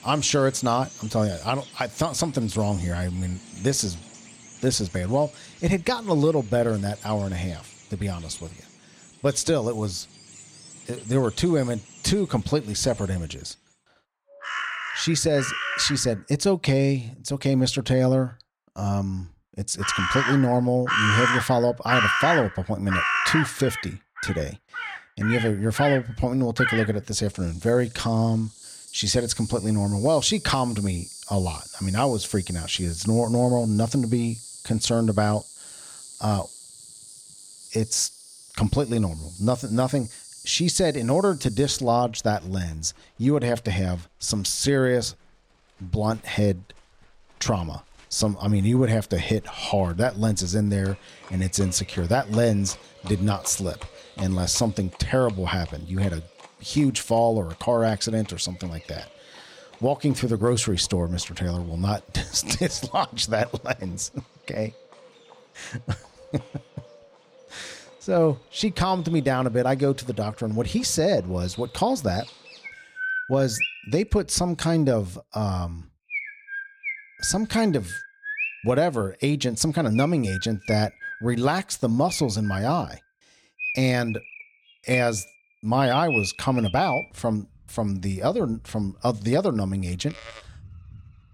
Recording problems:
animal sounds; loud; throughout; 7 dB below the speech

